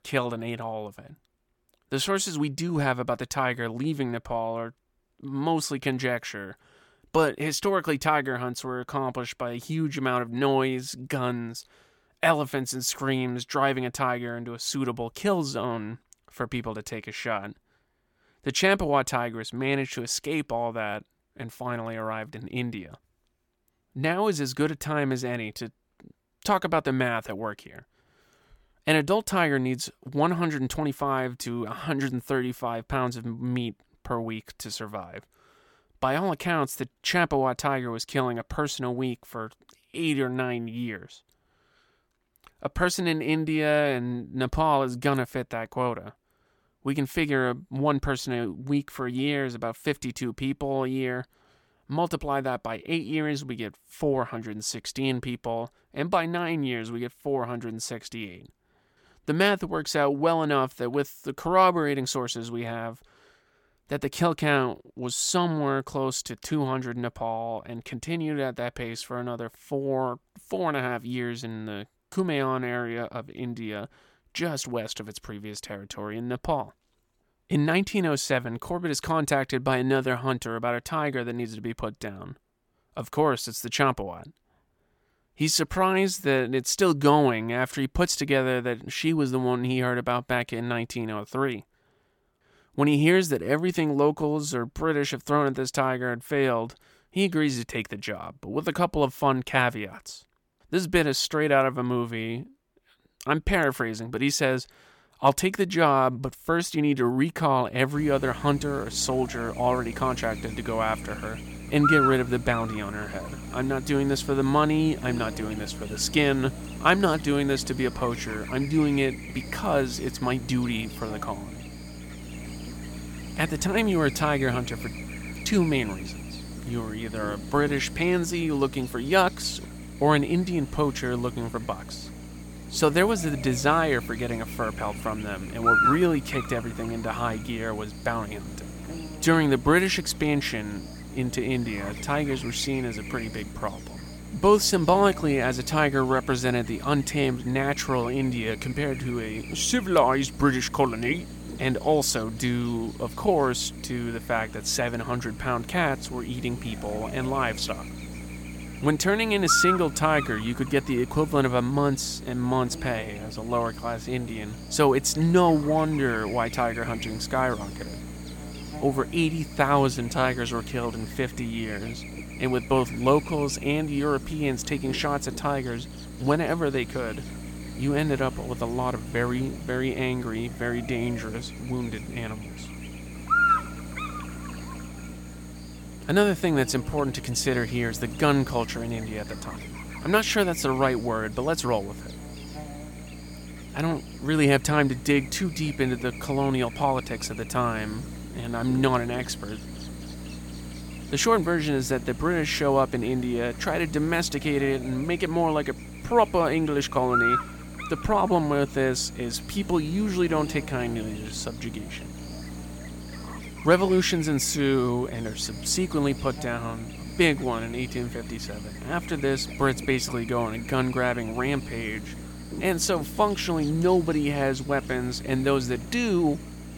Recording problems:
electrical hum; loud; from 1:48 on; 60 Hz, 8 dB below the speech

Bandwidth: 17 kHz